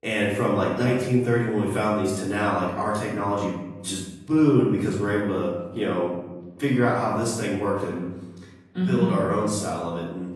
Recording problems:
off-mic speech; far
room echo; noticeable; dies away in 0.9 s
garbled, watery; slightly; nothing above 11 kHz

